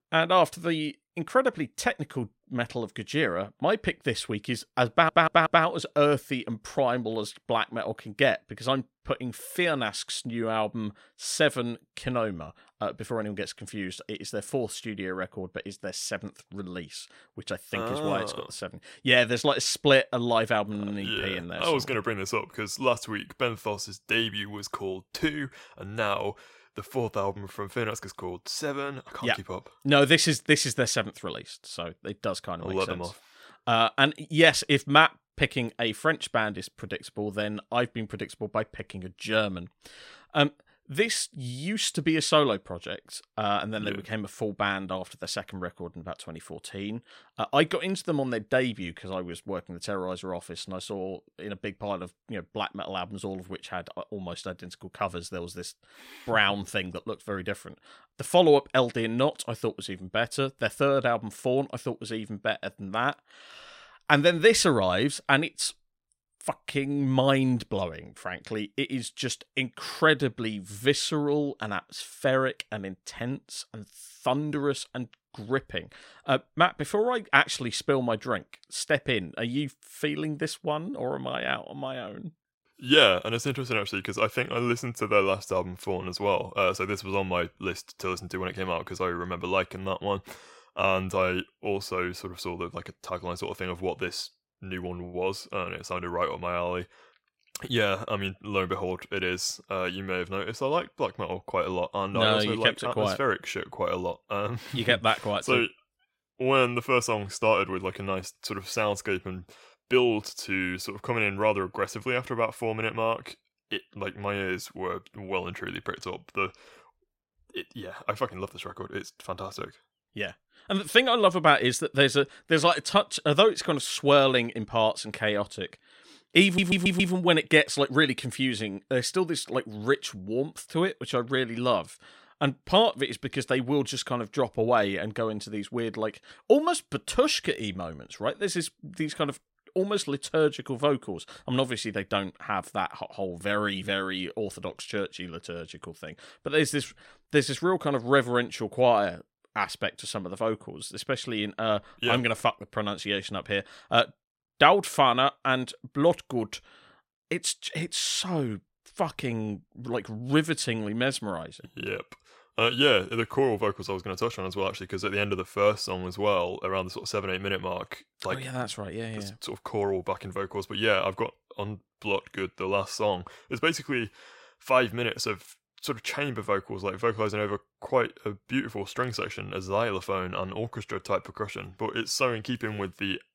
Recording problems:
audio stuttering; at 5 s and at 2:06

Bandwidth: 16 kHz